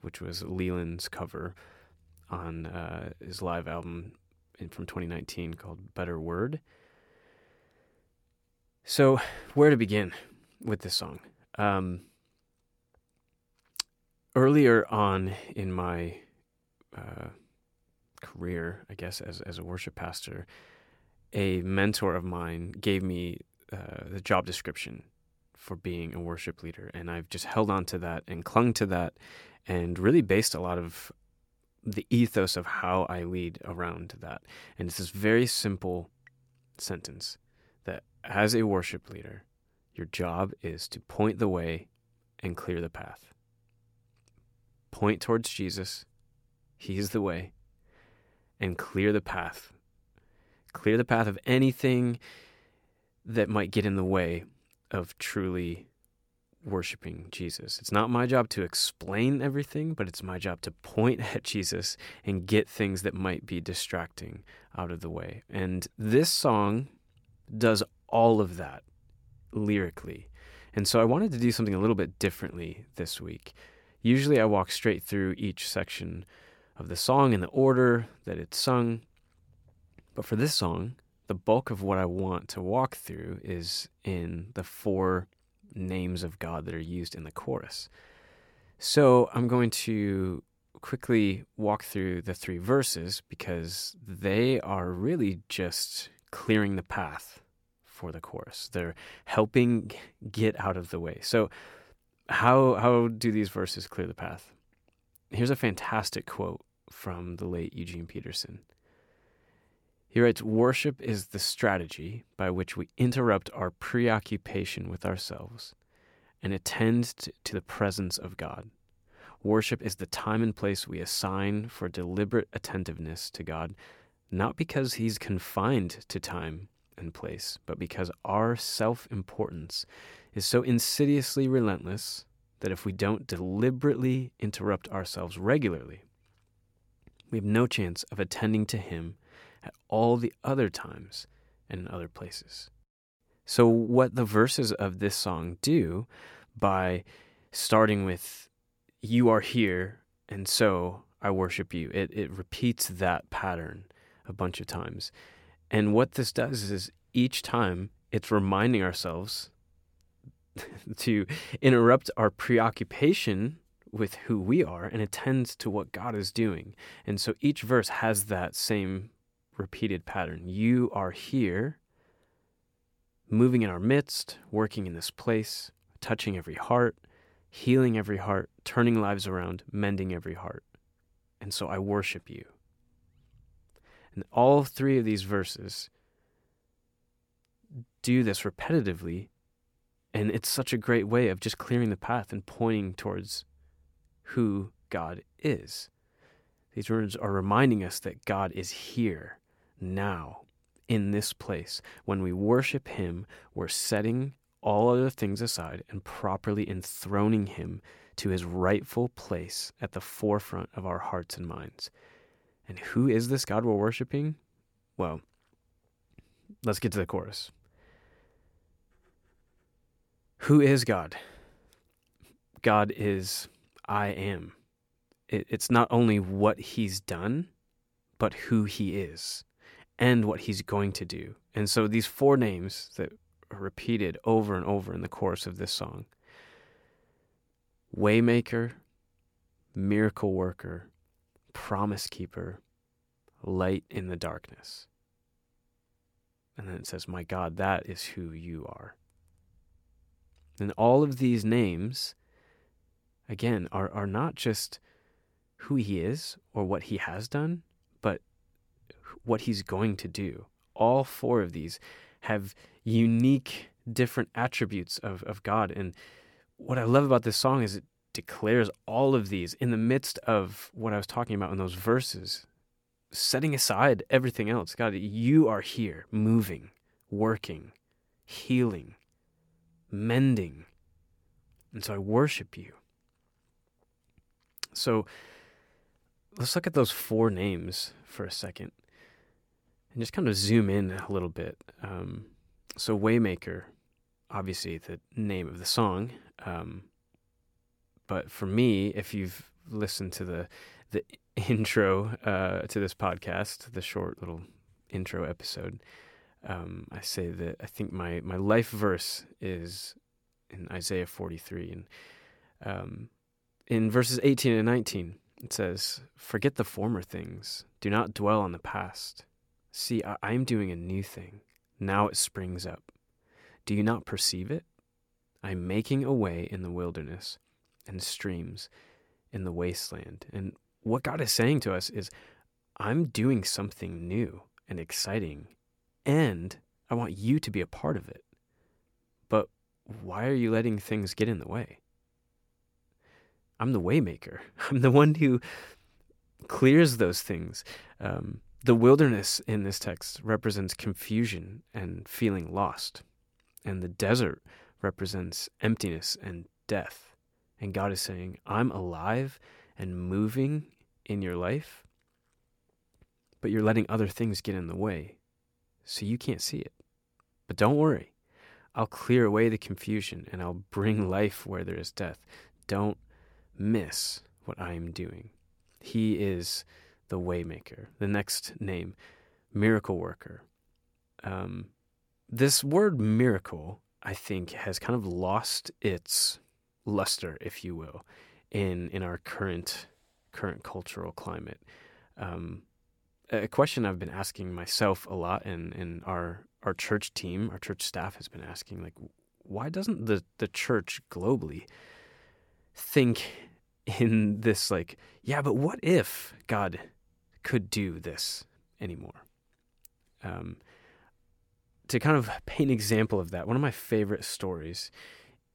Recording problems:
none

